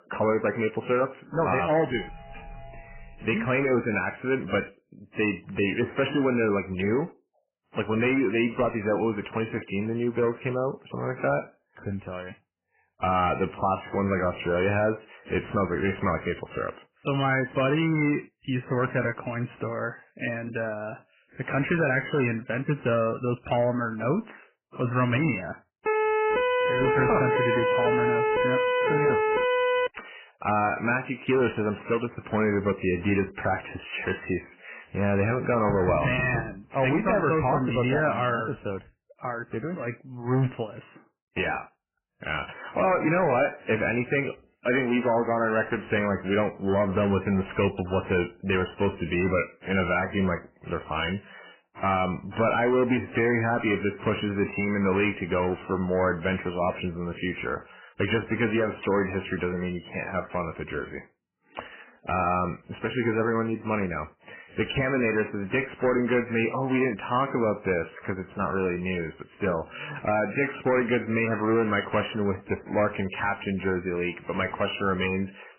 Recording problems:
garbled, watery; badly; nothing above 3 kHz
distortion; slight; 6% of the sound clipped
doorbell; faint; from 2 to 3.5 s; peak 15 dB below the speech
siren; loud; from 26 to 30 s; peak 3 dB above the speech
door banging; noticeable; at 36 s; peak 4 dB below the speech

